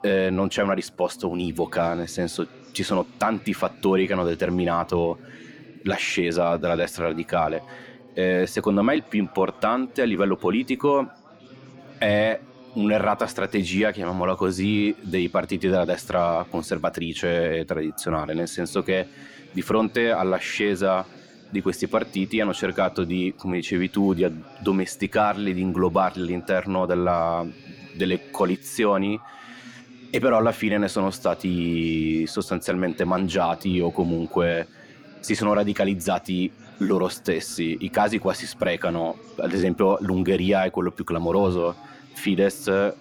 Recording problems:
background chatter; faint; throughout; 4 voices, 25 dB below the speech

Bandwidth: 18.5 kHz